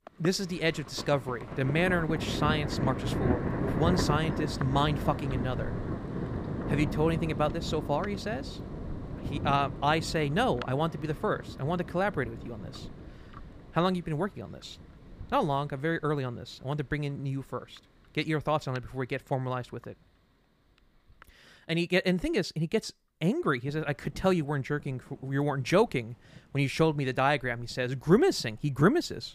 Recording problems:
rain or running water; loud; throughout; 6 dB below the speech

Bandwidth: 15 kHz